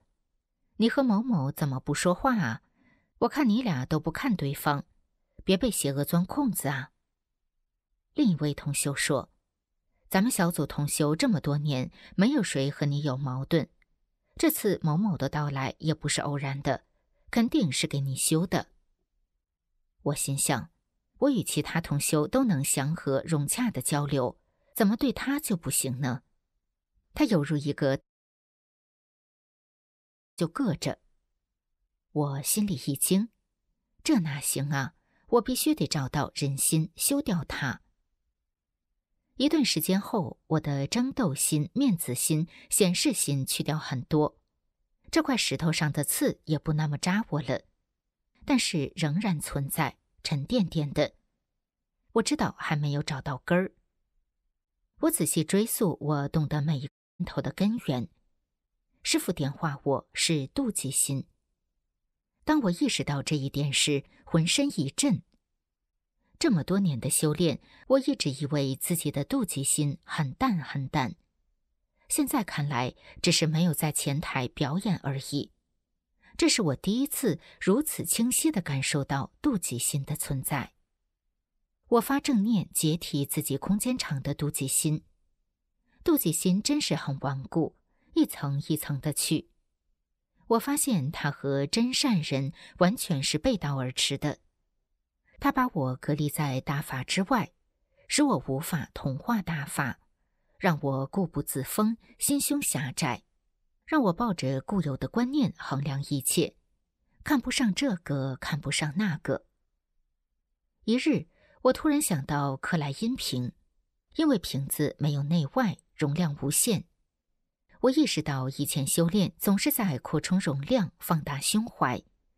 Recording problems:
audio cutting out; at 28 s for 2.5 s and at 57 s

